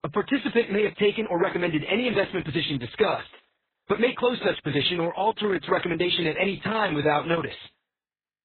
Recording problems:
garbled, watery; badly; nothing above 4 kHz
uneven, jittery; strongly; from 0.5 to 7 s

